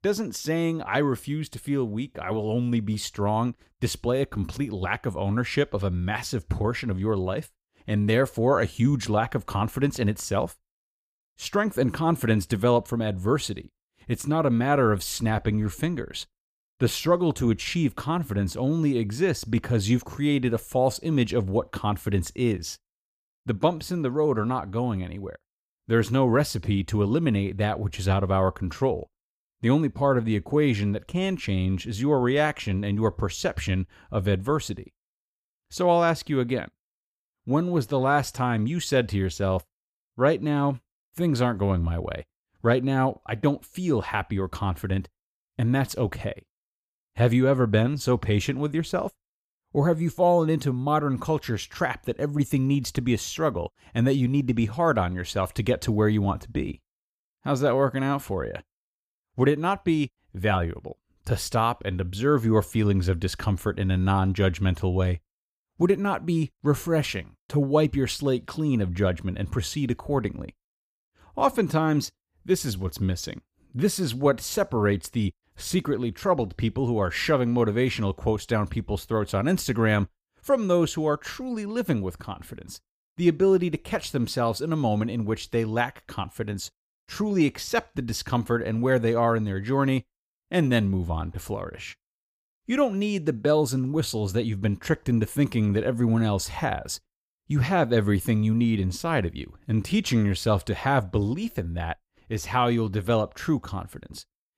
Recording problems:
none

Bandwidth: 15 kHz